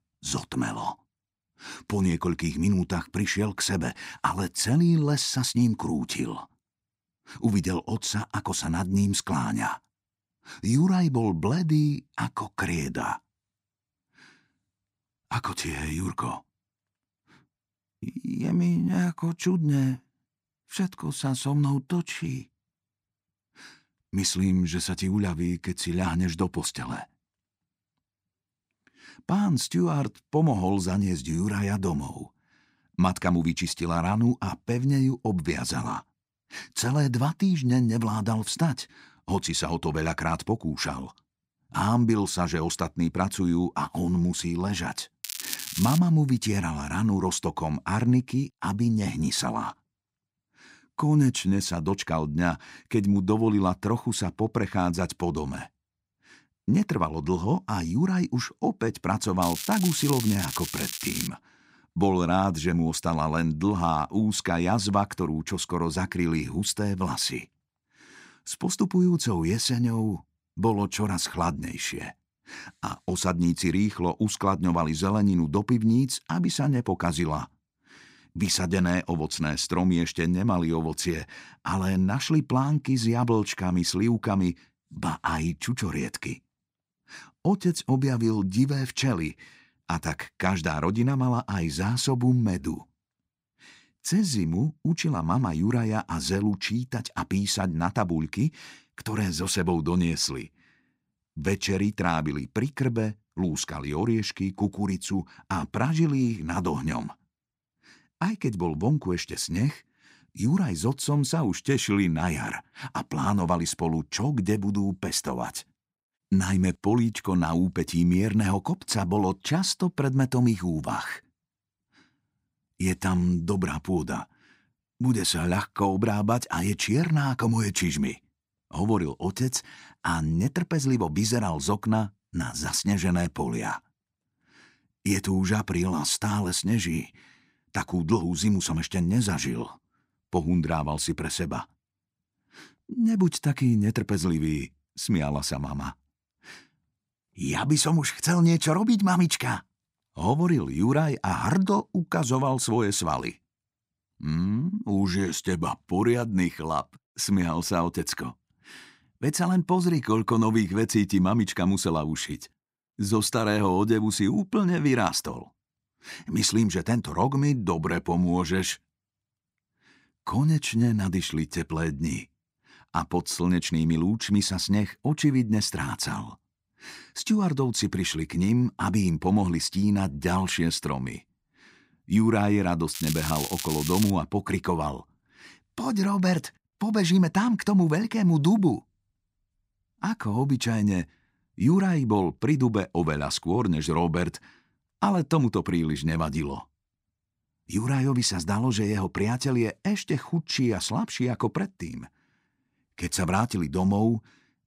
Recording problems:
crackling; loud; at 45 s, from 59 s to 1:01 and from 3:03 to 3:04; 6 dB below the speech

